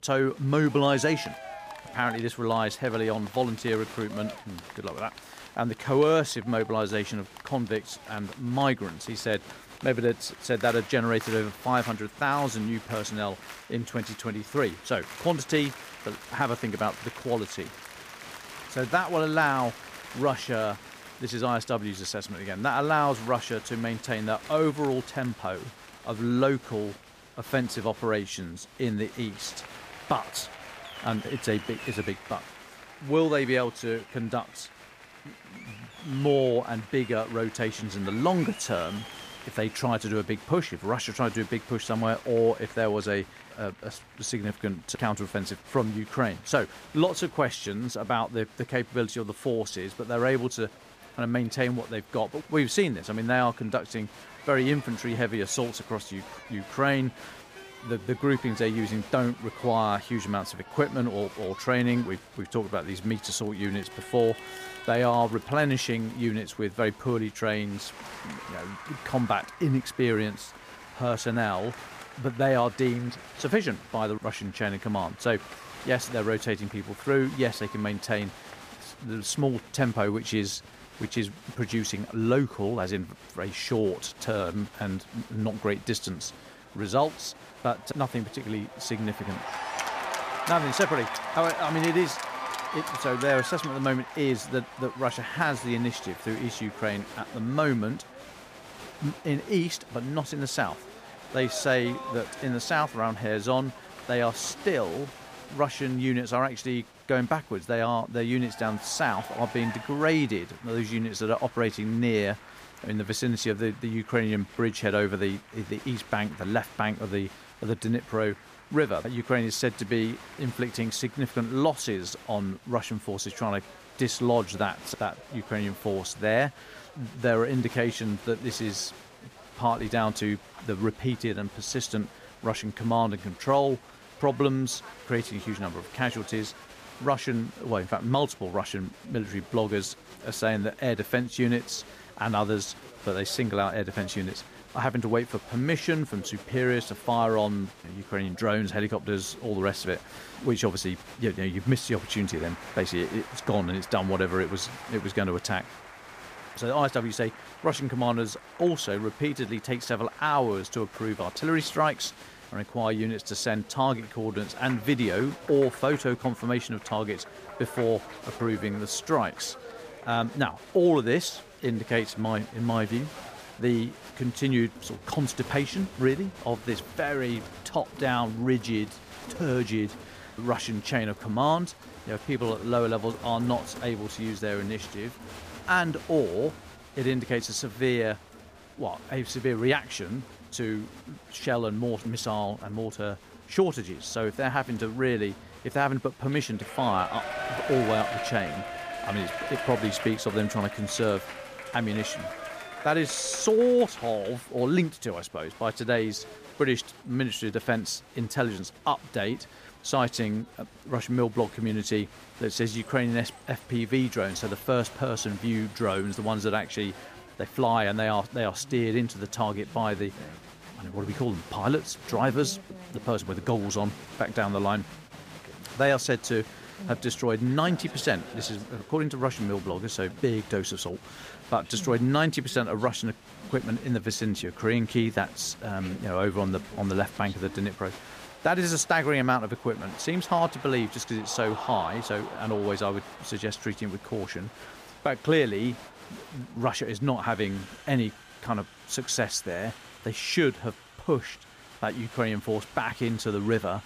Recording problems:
crowd noise; noticeable; throughout; 15 dB below the speech

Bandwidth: 15 kHz